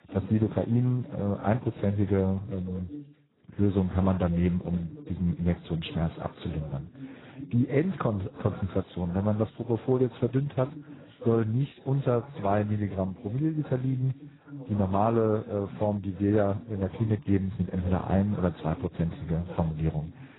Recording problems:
garbled, watery; badly; nothing above 4 kHz
voice in the background; noticeable; throughout; 15 dB below the speech

